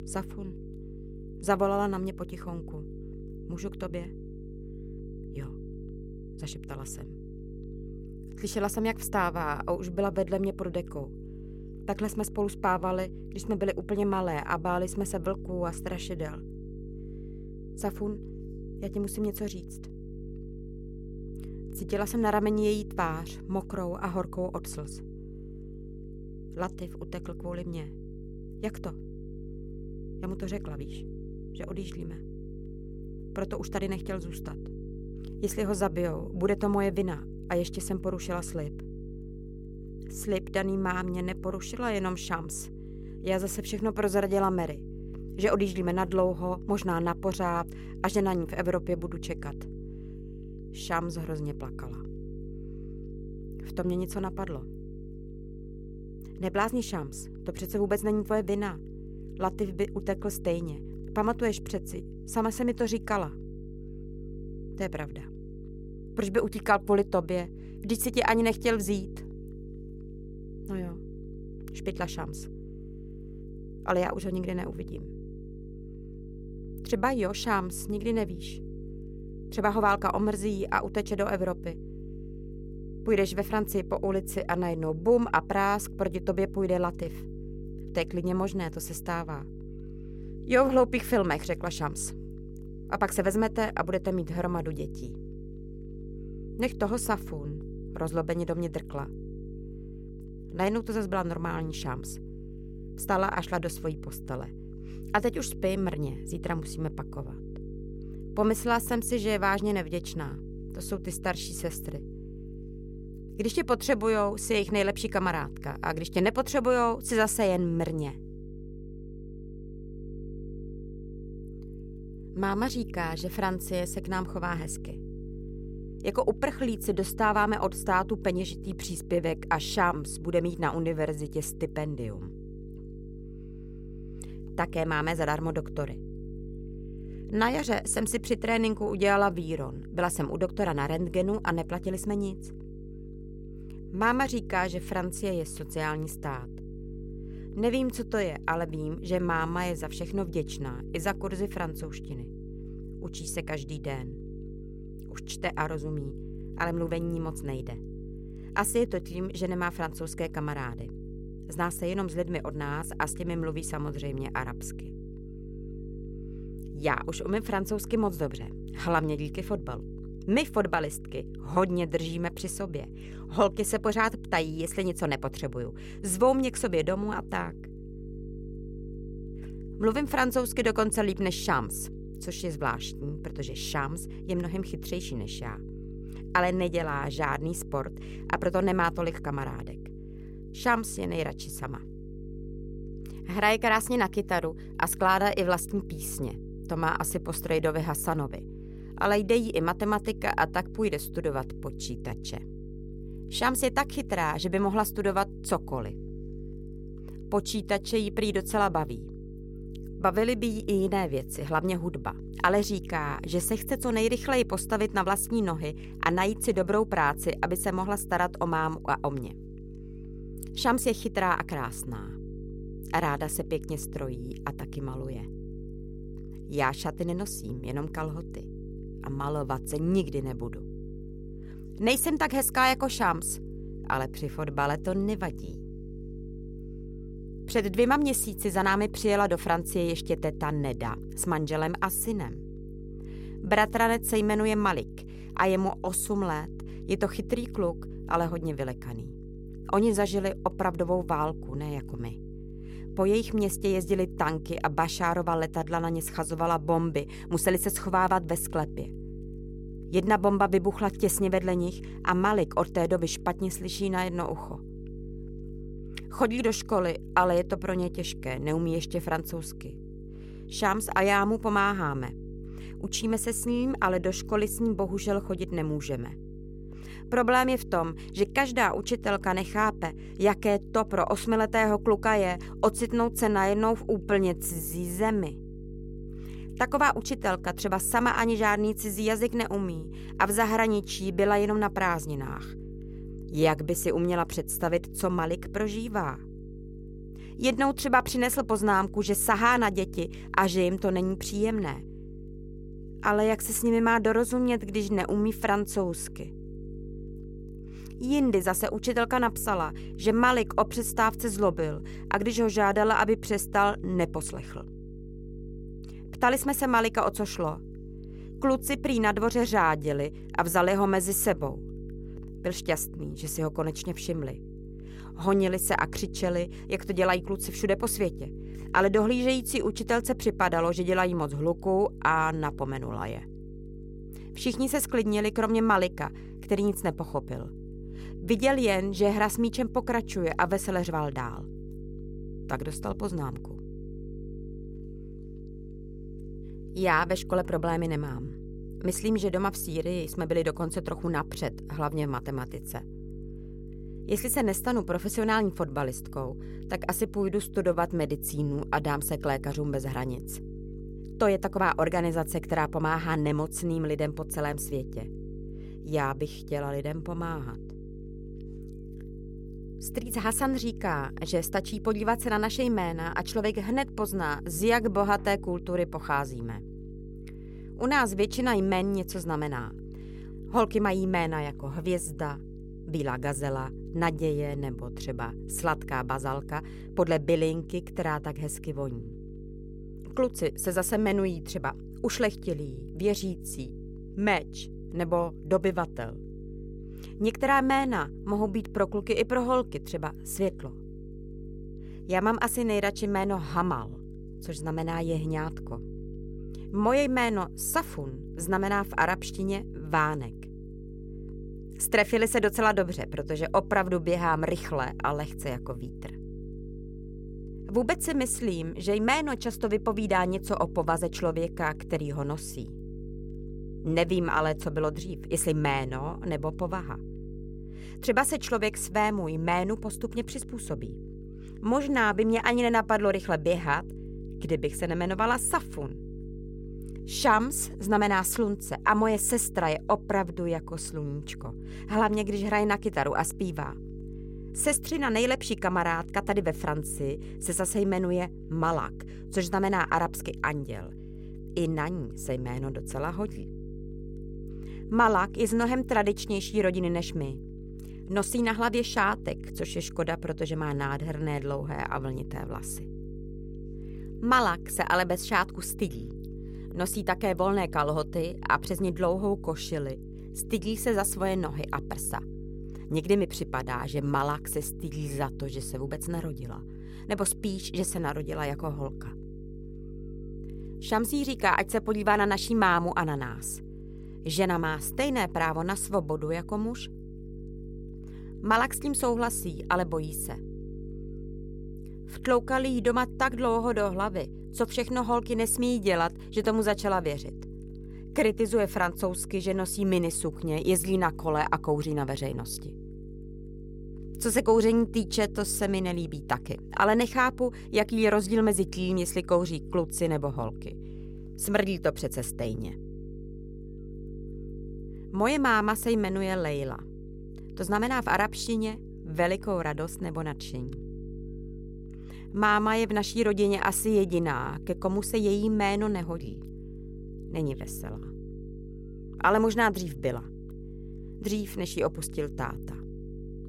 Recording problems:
electrical hum; noticeable; throughout; 50 Hz, 20 dB below the speech

